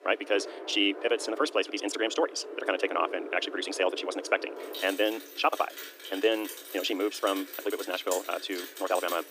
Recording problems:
wrong speed, natural pitch; too fast; 1.6 times normal speed
thin; somewhat; fading below 300 Hz
rain or running water; noticeable; throughout; 10 dB below the speech

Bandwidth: 15 kHz